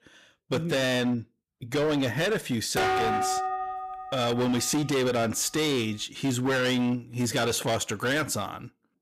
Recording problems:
distortion; heavy; 18% of the sound clipped
clattering dishes; loud; from 3 to 4.5 s; peak 3 dB above the speech

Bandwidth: 14.5 kHz